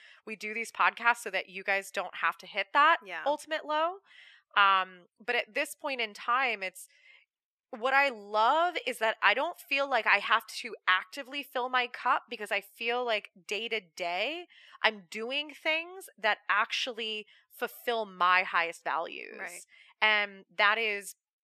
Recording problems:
thin; very; fading below 500 Hz

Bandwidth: 14.5 kHz